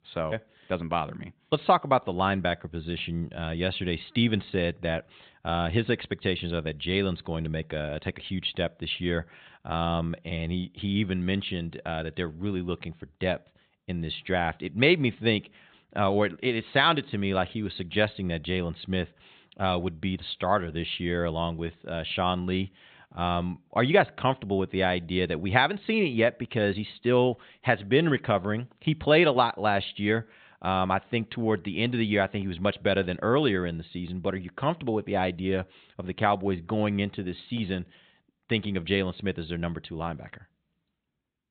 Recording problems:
high frequencies cut off; severe; nothing above 4 kHz

